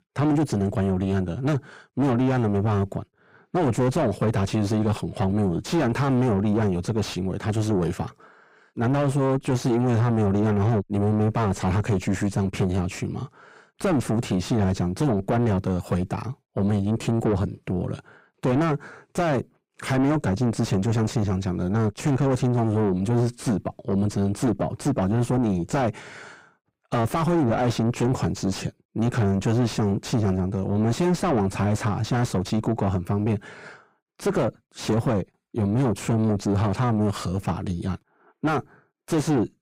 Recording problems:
distortion; heavy; 5 dB below the speech

